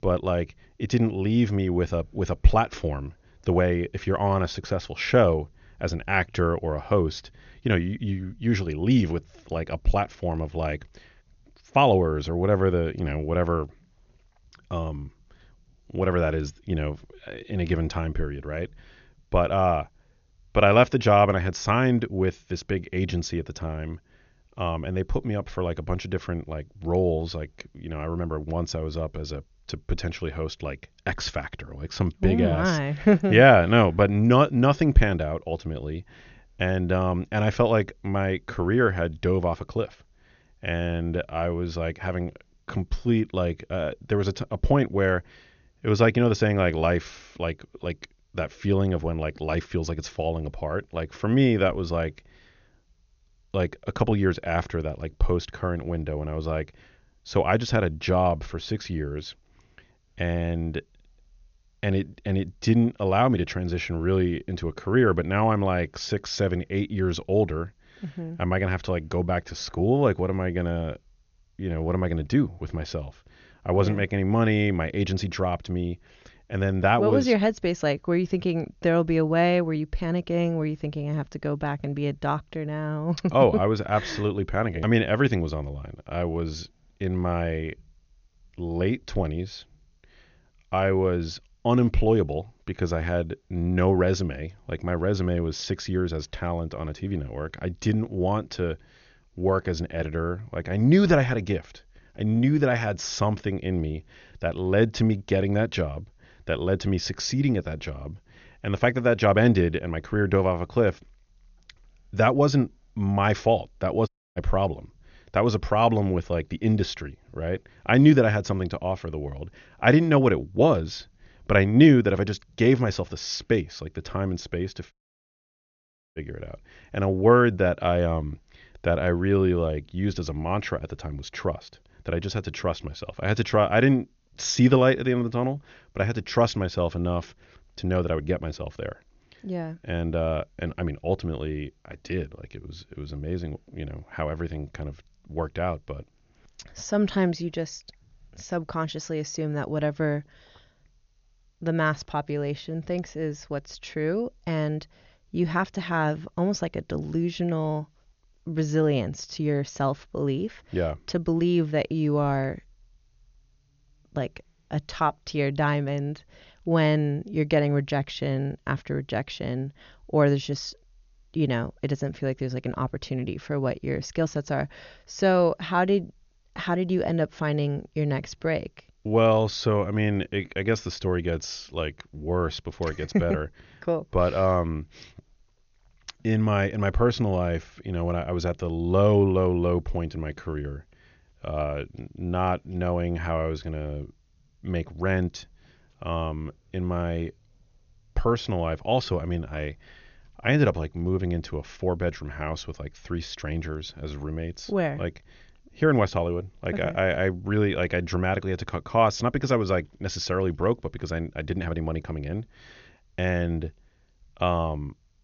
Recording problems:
high frequencies cut off; noticeable; nothing above 6.5 kHz
audio cutting out; at 1:54 and at 2:05 for 1 s

